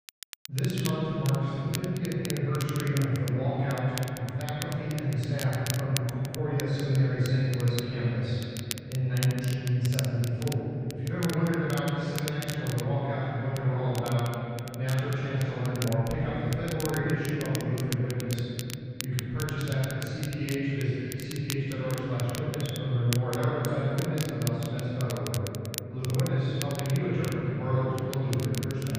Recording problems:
room echo; strong; dies away in 3 s
off-mic speech; far
muffled; very; fading above 2.5 kHz
crackle, like an old record; very faint; 10 dB below the speech

